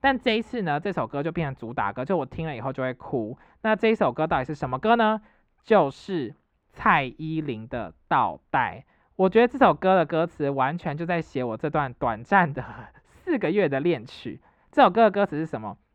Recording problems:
muffled; very; fading above 3.5 kHz

